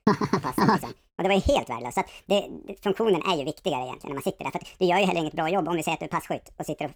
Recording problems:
wrong speed and pitch; too fast and too high; 1.6 times normal speed

